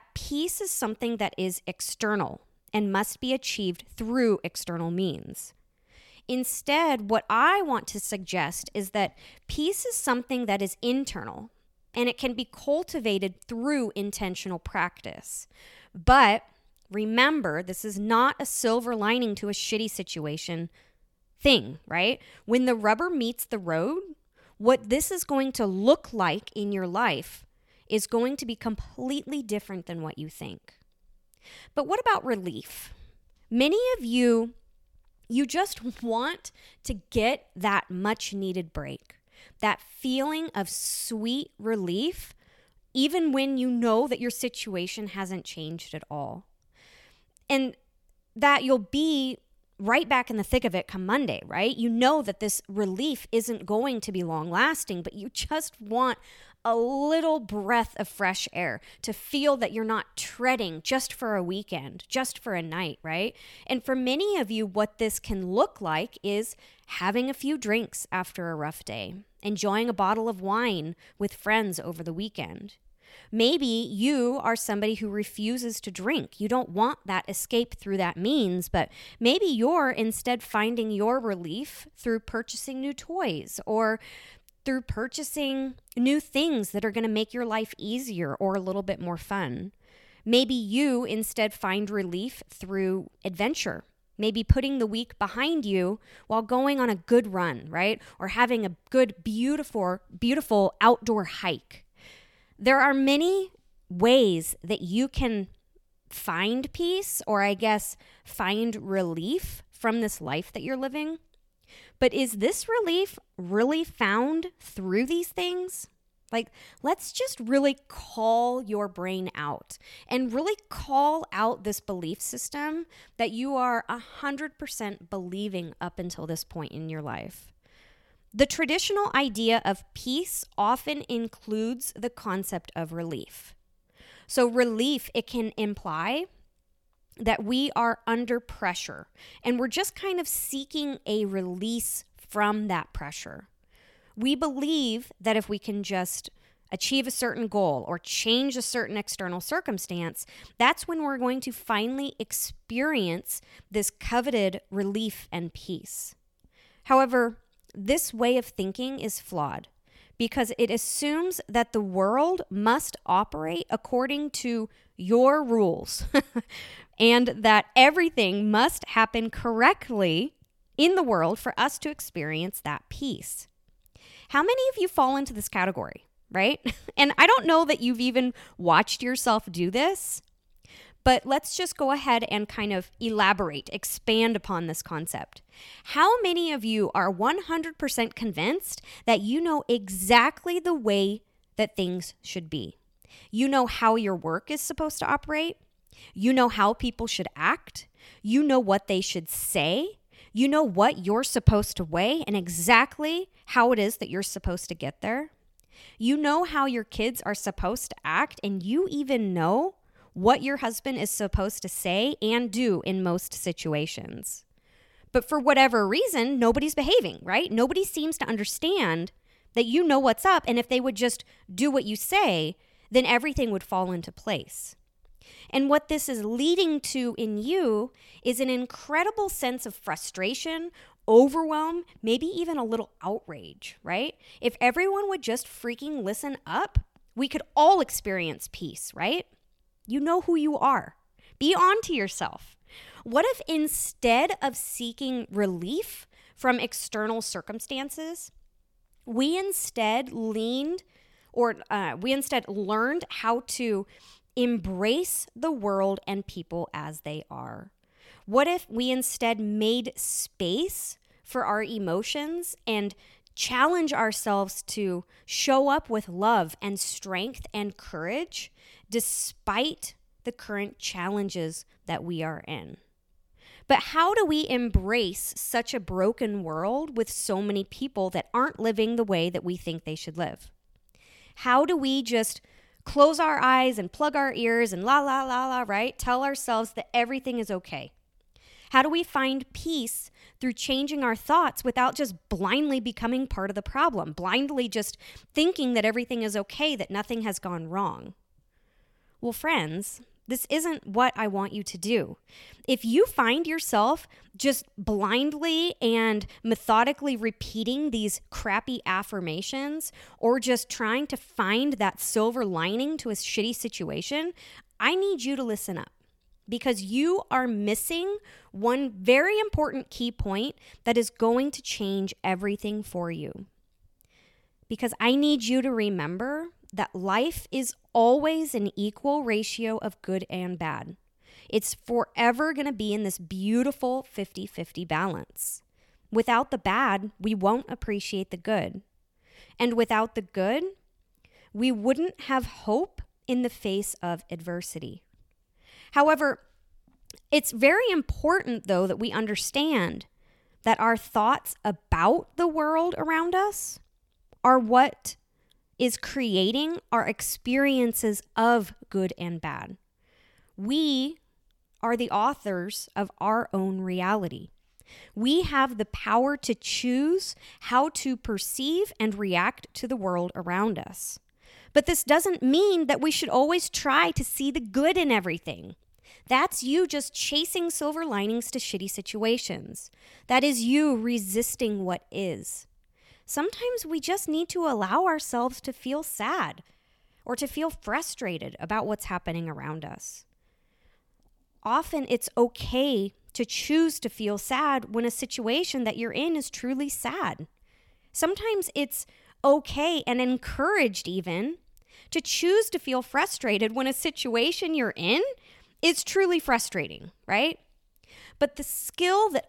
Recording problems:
none

